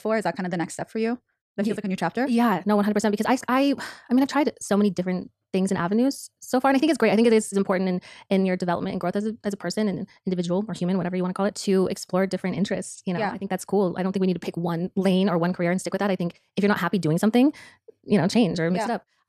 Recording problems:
wrong speed, natural pitch; too fast; 1.6 times normal speed

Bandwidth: 14 kHz